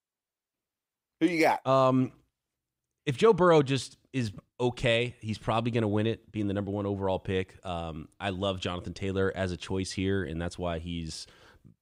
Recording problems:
none

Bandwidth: 15.5 kHz